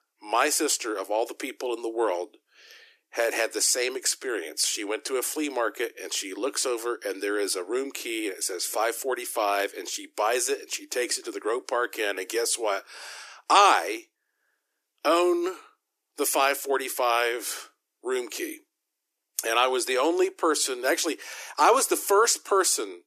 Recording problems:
thin; very; fading below 300 Hz

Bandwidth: 14.5 kHz